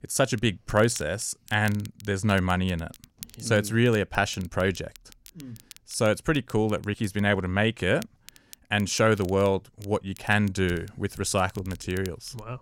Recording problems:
crackle, like an old record; faint; 25 dB below the speech

